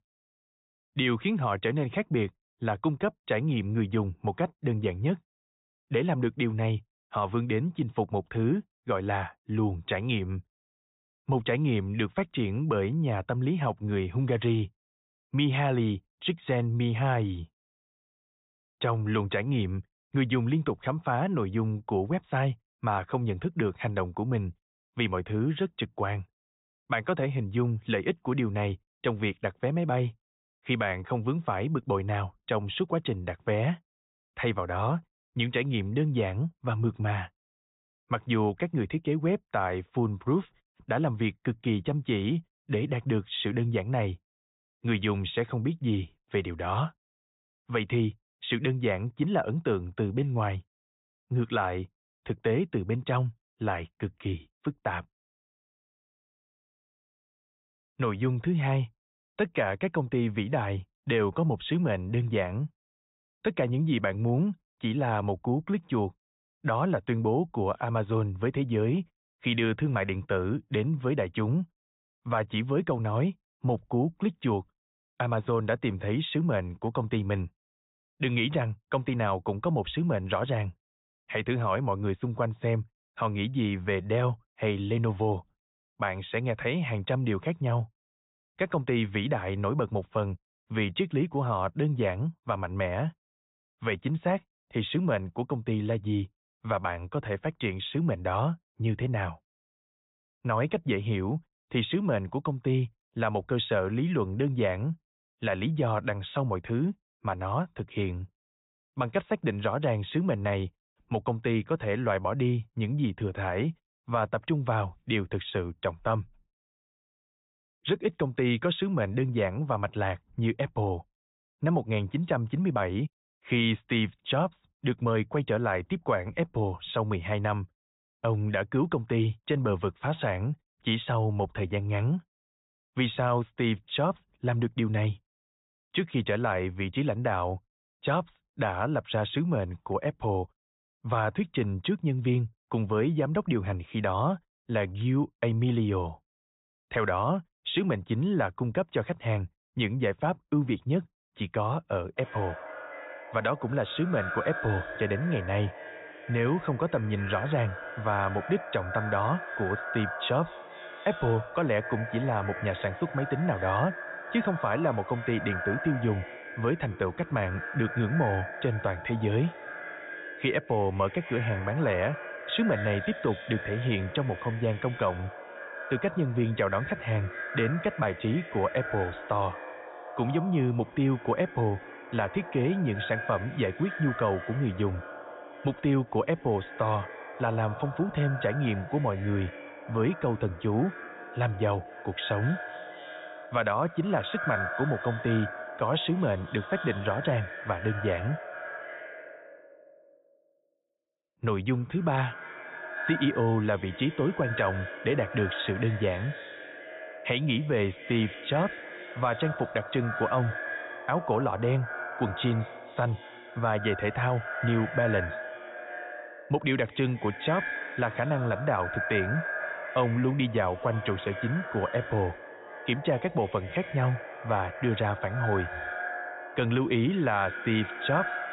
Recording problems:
echo of what is said; strong; from 2:32 on; 240 ms later, 9 dB below the speech
high frequencies cut off; severe; nothing above 4 kHz

